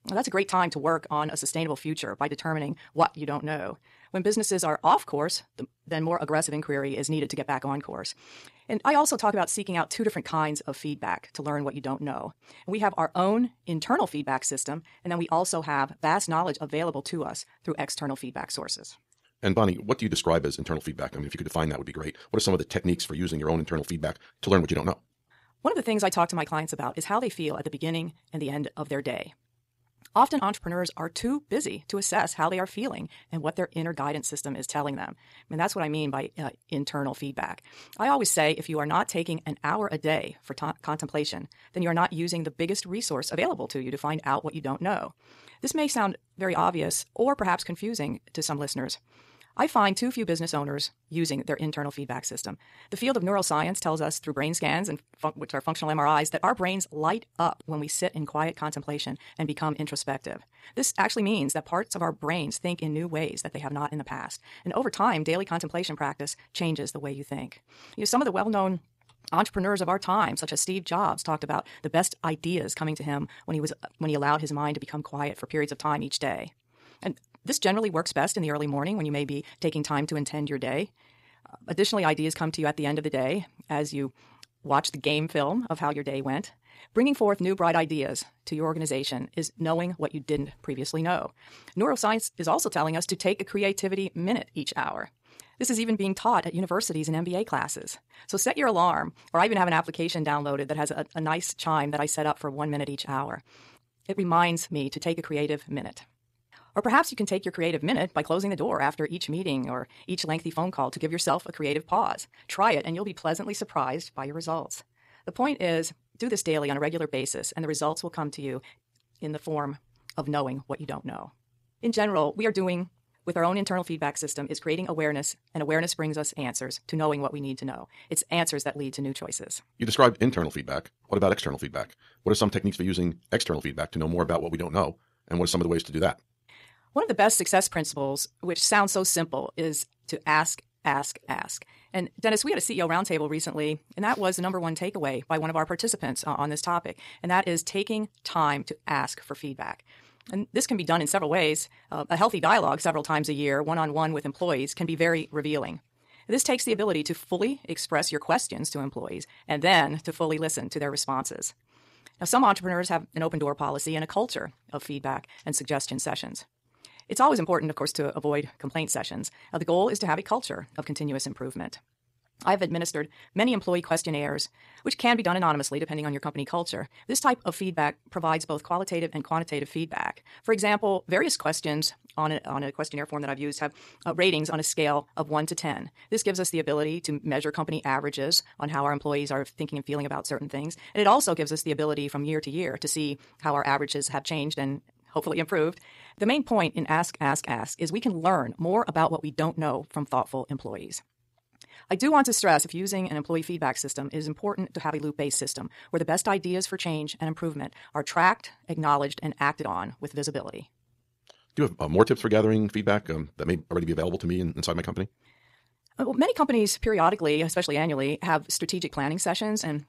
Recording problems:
wrong speed, natural pitch; too fast; 1.8 times normal speed

